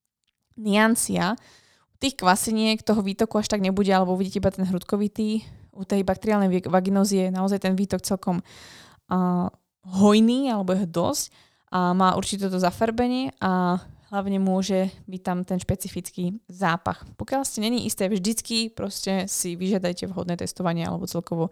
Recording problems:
none

